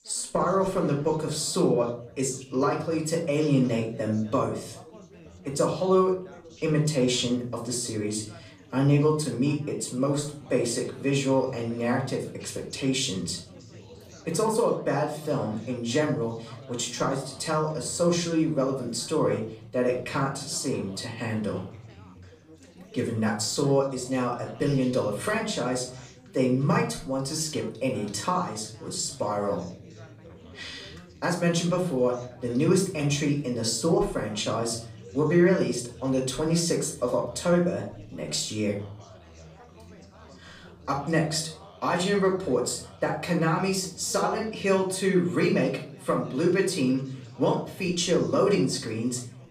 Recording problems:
off-mic speech; far
room echo; slight; dies away in 0.4 s
background chatter; faint; throughout; 4 voices, 20 dB below the speech

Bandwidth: 15 kHz